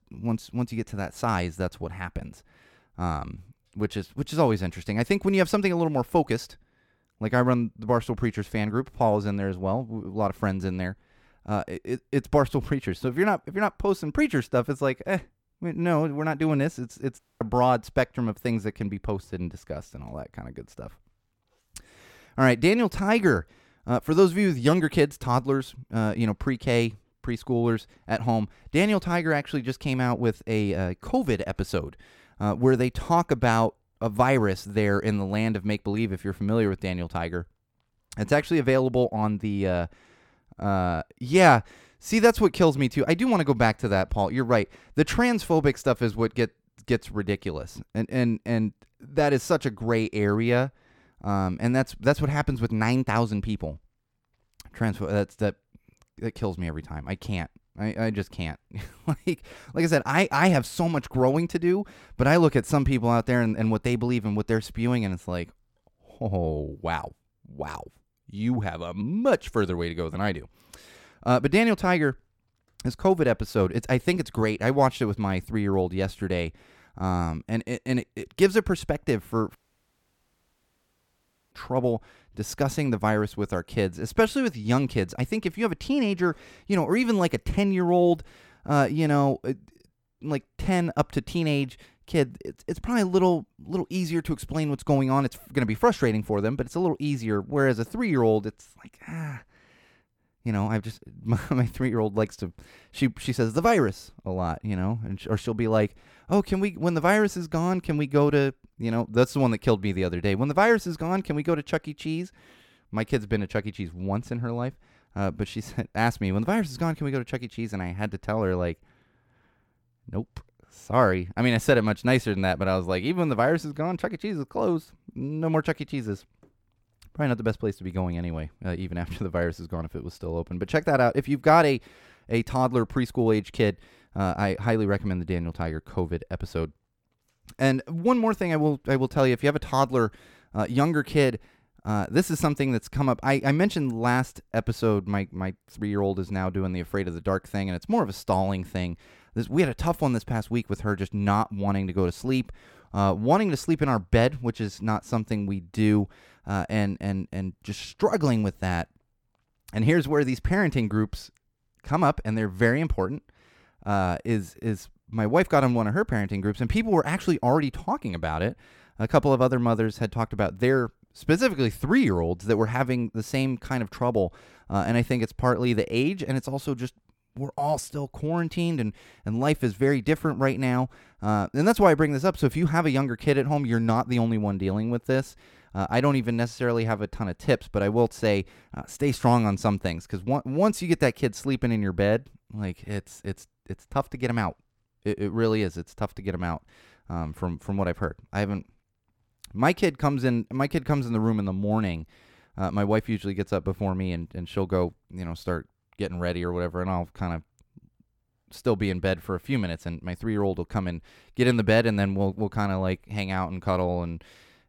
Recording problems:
audio cutting out; at 17 s and at 1:20 for 2 s

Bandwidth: 18 kHz